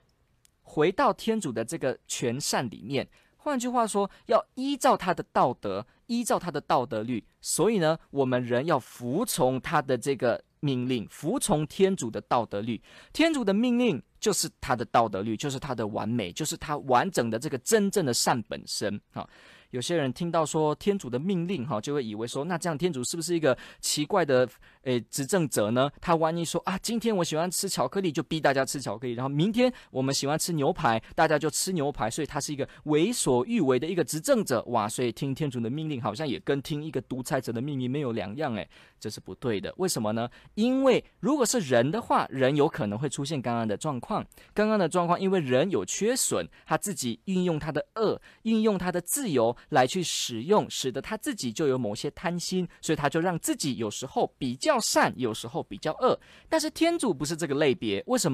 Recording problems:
abrupt cut into speech; at the end

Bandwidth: 14.5 kHz